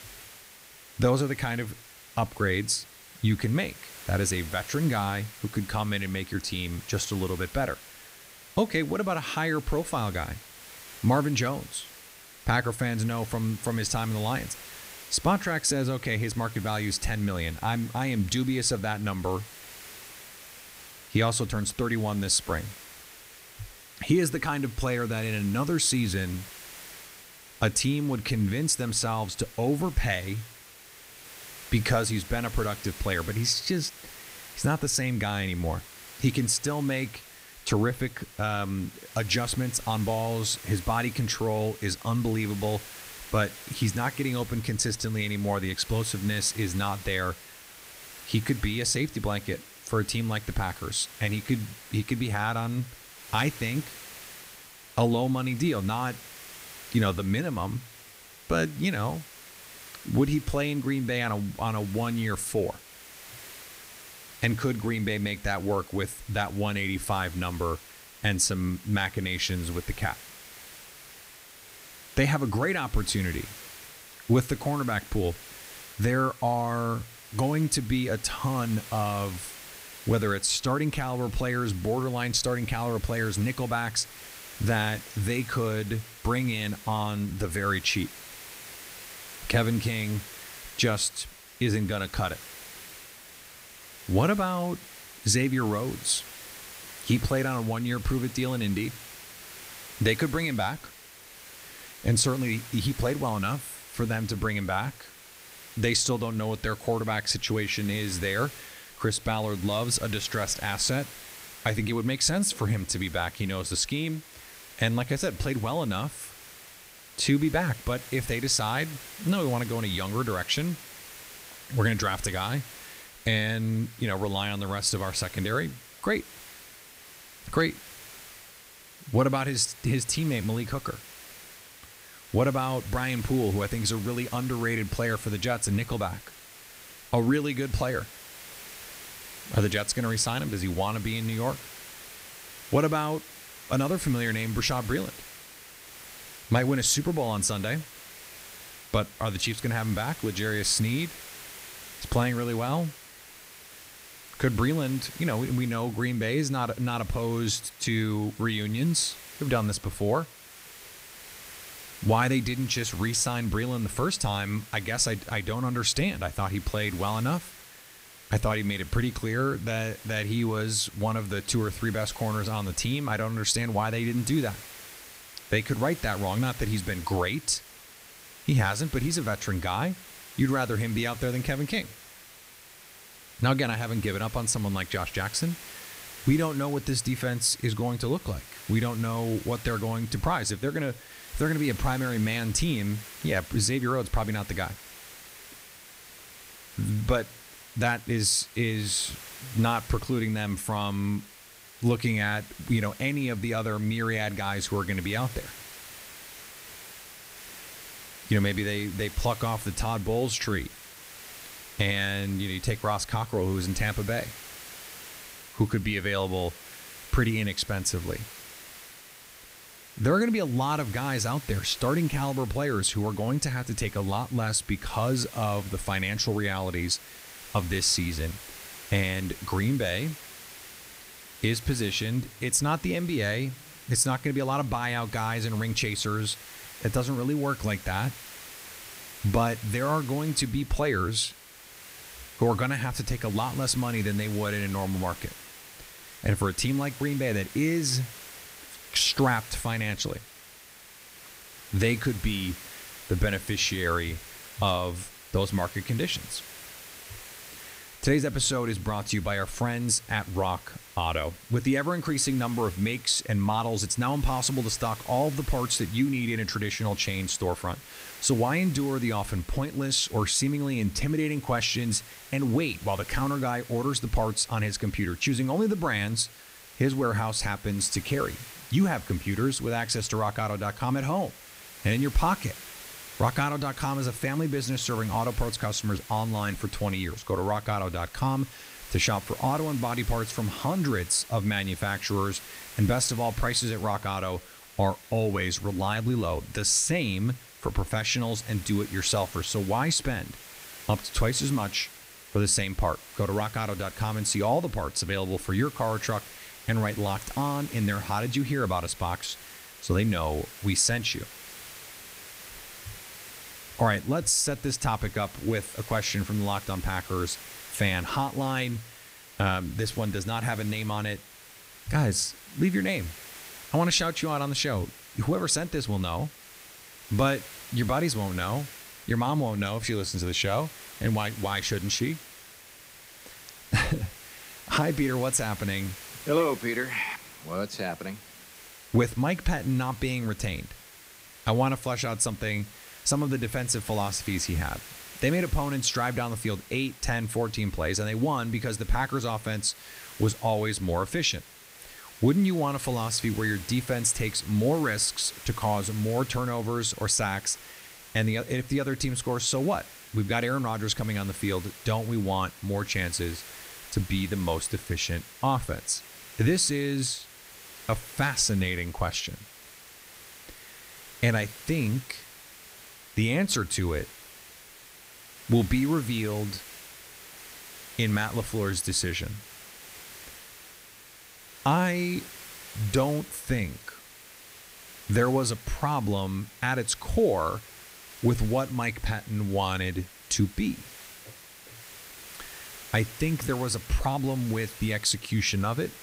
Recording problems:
hiss; noticeable; throughout; 15 dB below the speech

